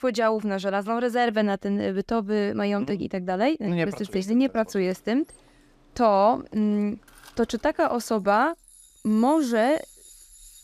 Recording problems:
machinery noise; faint; from 4.5 s on; 25 dB below the speech

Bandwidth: 14.5 kHz